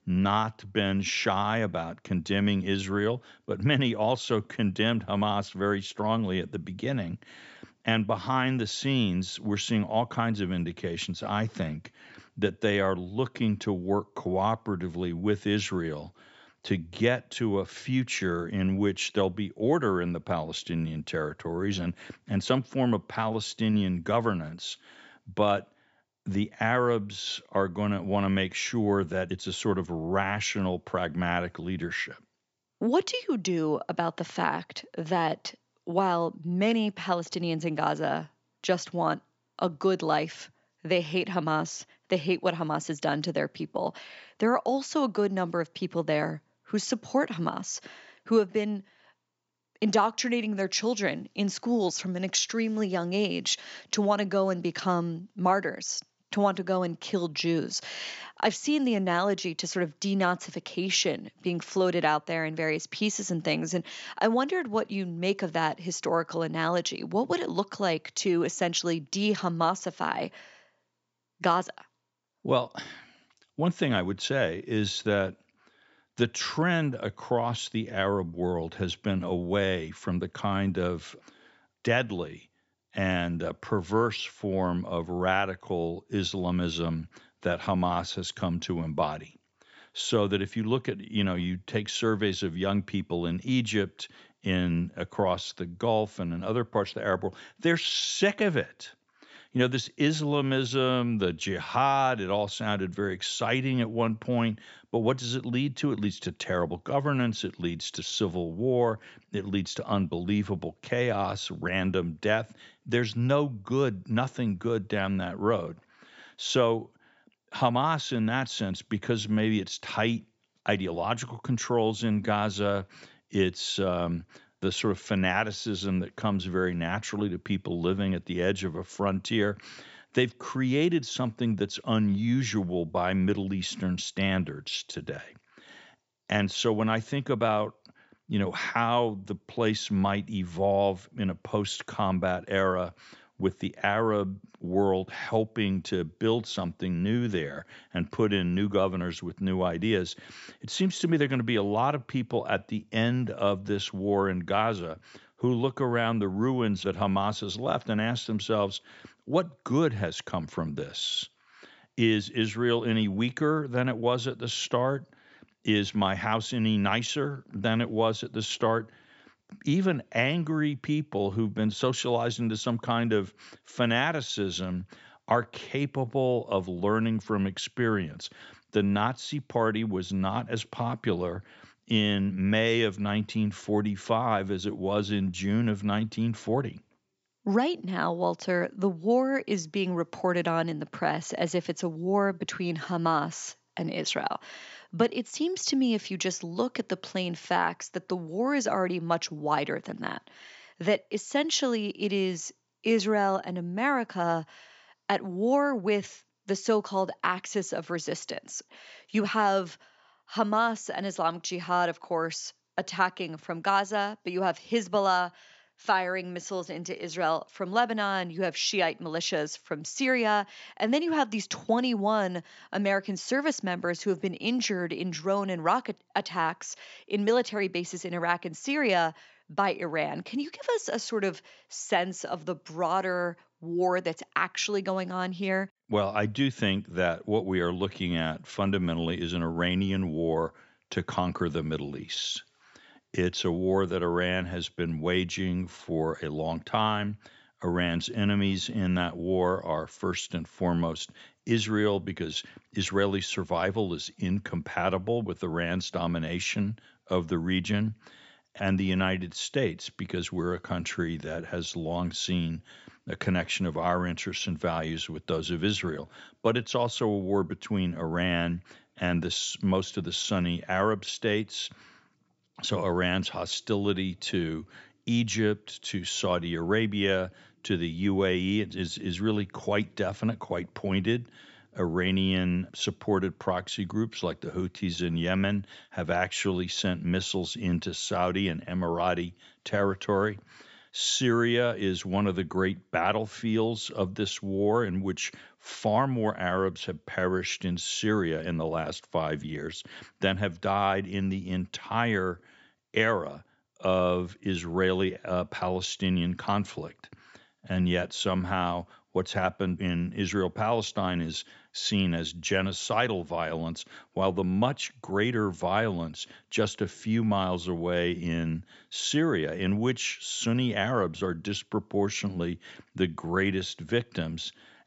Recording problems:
high frequencies cut off; noticeable; nothing above 8 kHz

